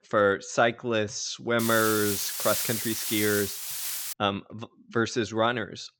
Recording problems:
high frequencies cut off; noticeable; nothing above 8 kHz
hiss; loud; from 1.5 to 4 s; 2 dB below the speech

